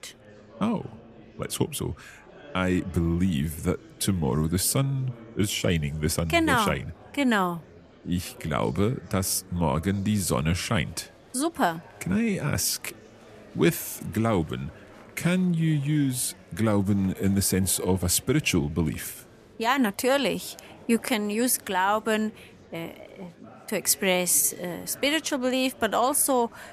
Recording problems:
murmuring crowd; faint; throughout; 25 dB below the speech

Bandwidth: 14.5 kHz